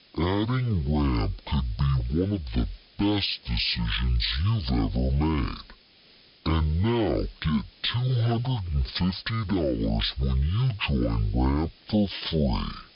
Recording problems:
wrong speed and pitch; too slow and too low; 0.5 times normal speed
high frequencies cut off; noticeable; nothing above 5.5 kHz
hiss; faint; throughout; 25 dB below the speech

